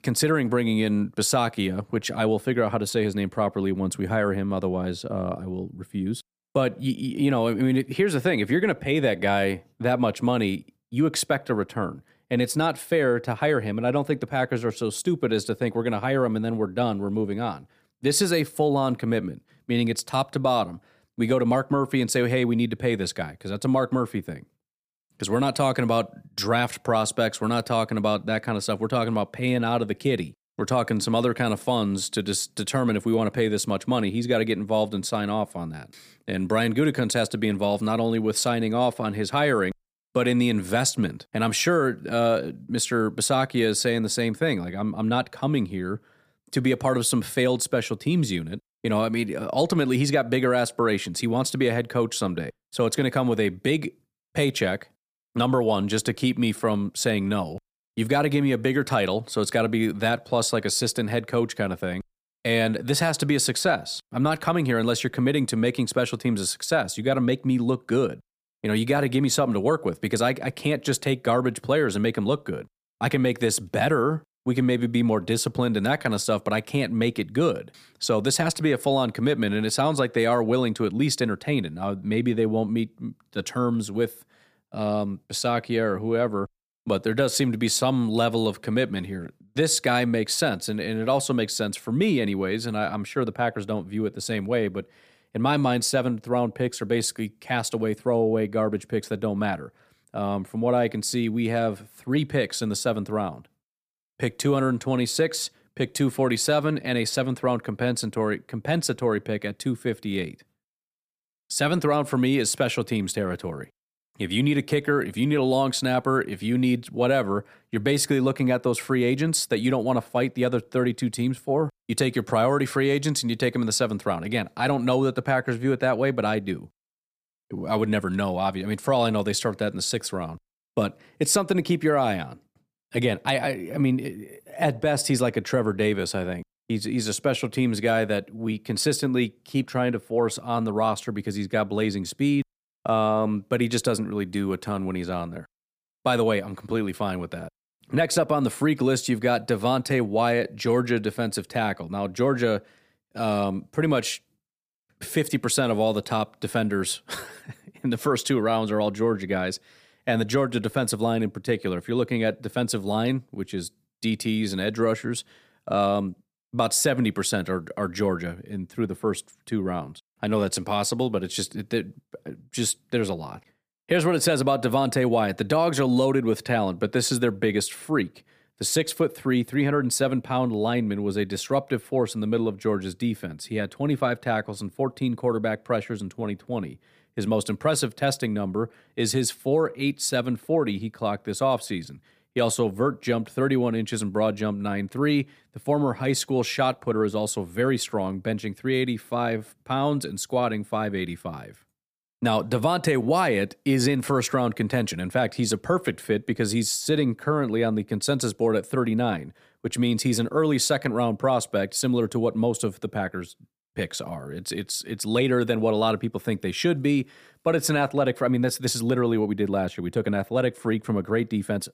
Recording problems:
none

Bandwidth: 15 kHz